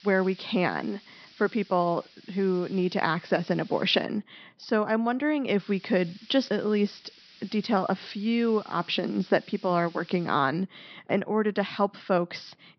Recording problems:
high frequencies cut off; noticeable; nothing above 5.5 kHz
hiss; faint; until 4 s and from 5.5 to 11 s; 25 dB below the speech

